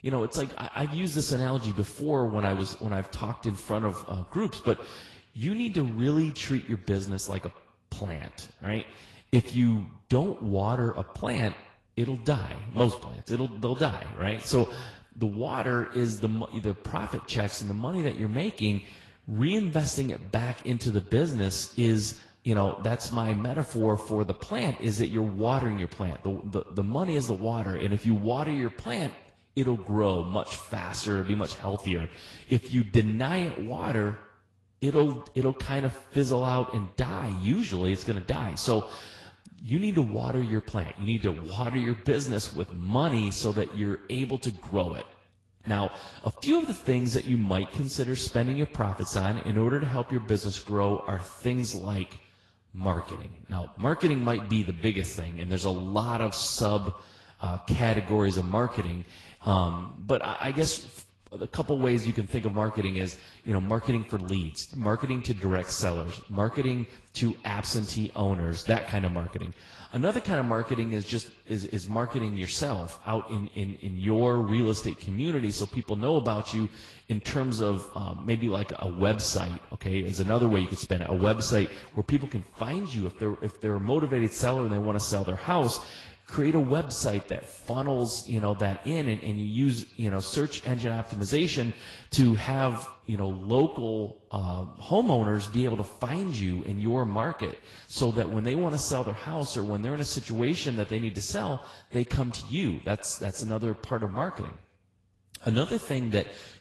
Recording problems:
echo of what is said; faint; throughout; 110 ms later, 20 dB below the speech
garbled, watery; slightly; nothing above 12 kHz

